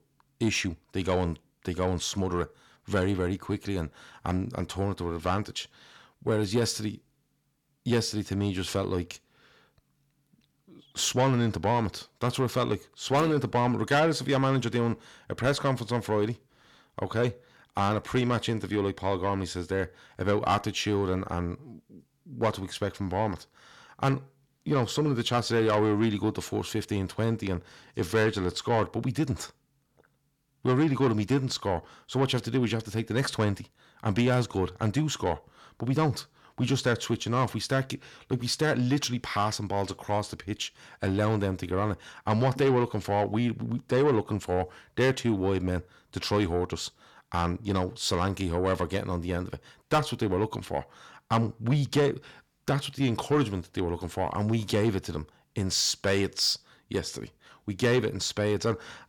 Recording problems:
distortion; slight; 10 dB below the speech

